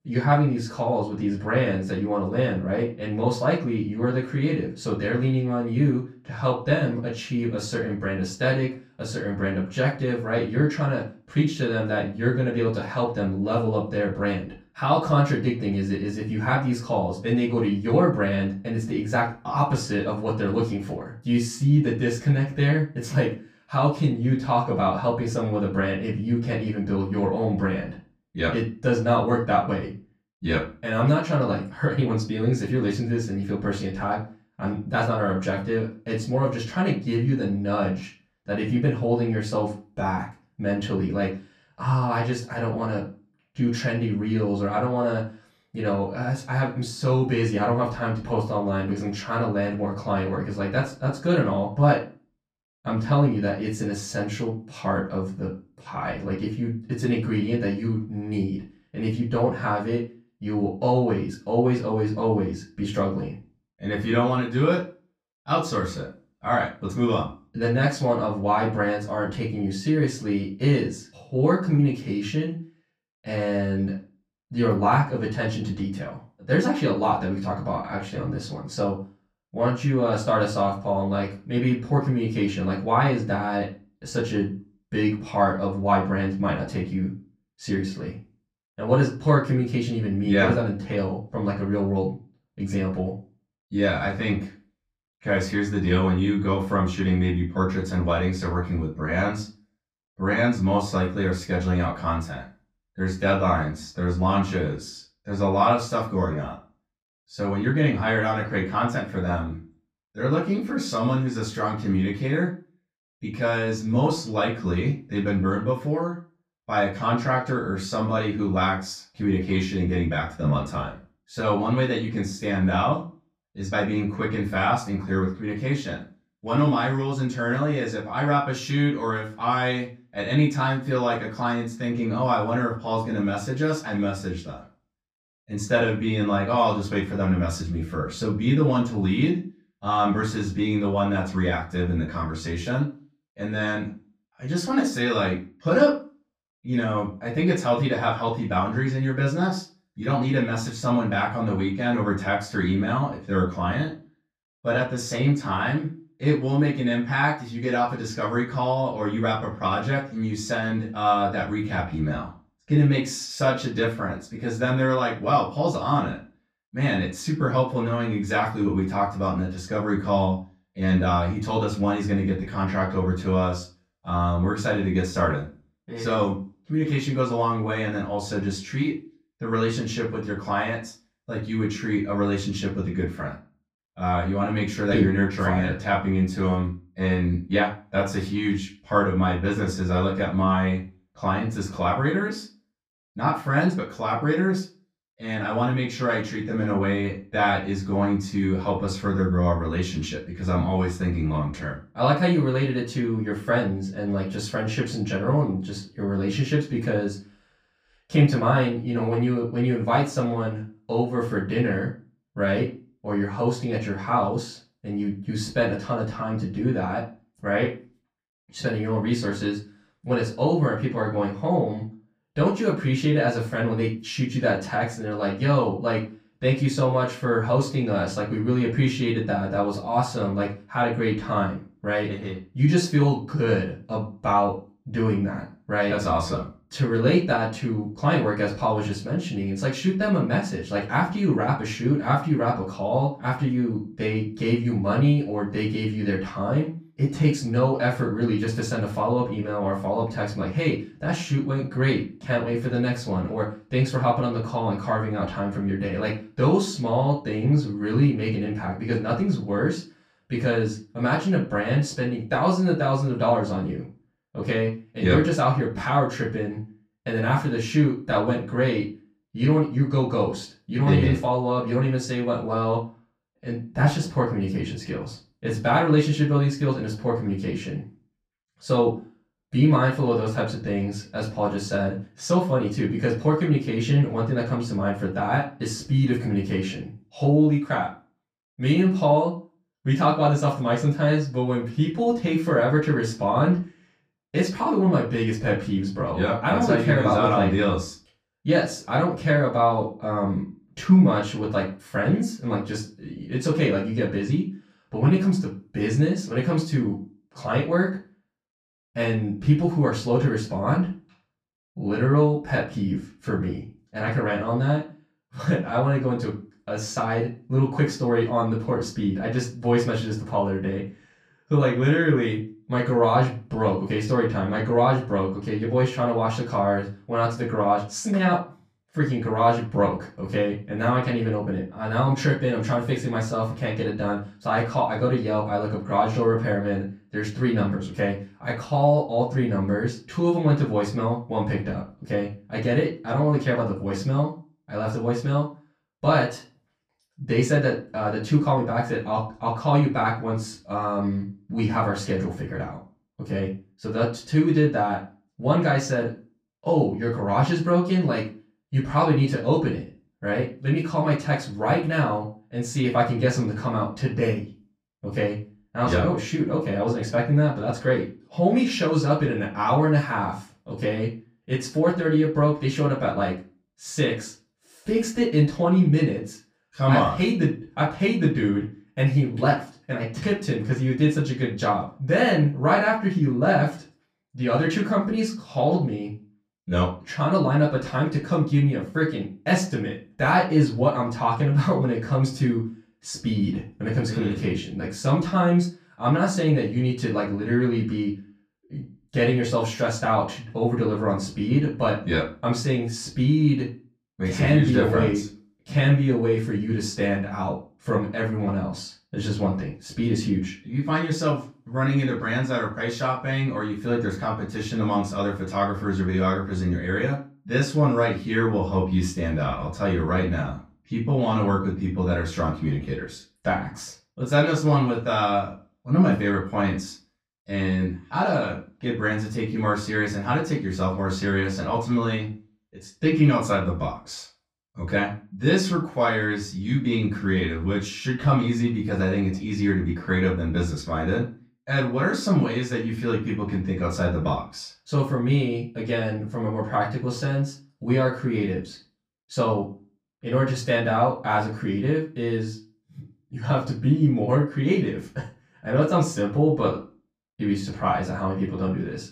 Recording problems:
off-mic speech; far
room echo; slight; dies away in 0.3 s

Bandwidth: 15.5 kHz